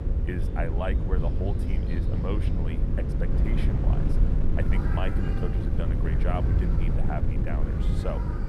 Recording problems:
animal sounds; very loud; throughout; as loud as the speech
wind noise on the microphone; heavy; 2 dB below the speech
electrical hum; loud; throughout; 50 Hz, 8 dB below the speech

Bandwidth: 13.5 kHz